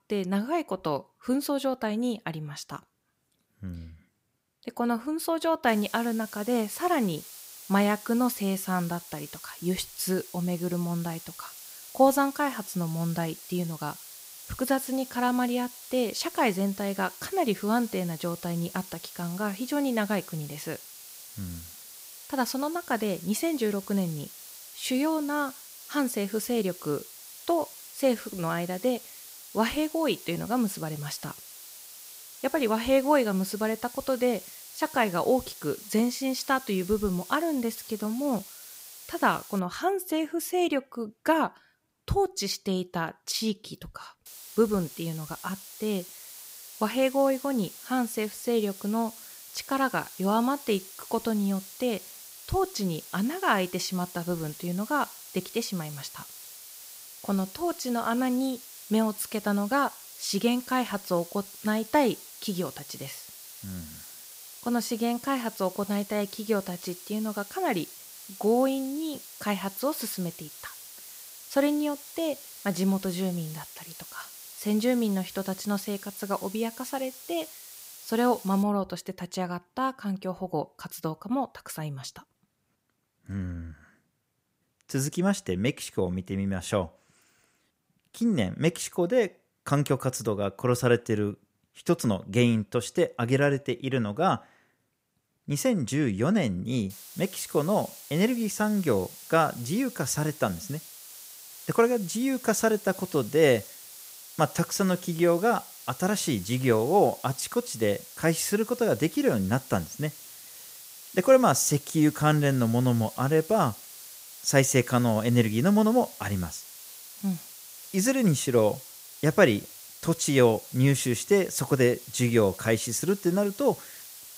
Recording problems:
hiss; noticeable; from 5.5 to 40 s, from 44 s to 1:19 and from 1:37 on; 15 dB below the speech

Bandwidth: 15.5 kHz